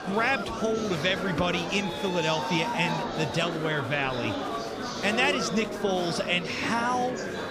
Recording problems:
murmuring crowd; loud; throughout; 4 dB below the speech

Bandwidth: 15 kHz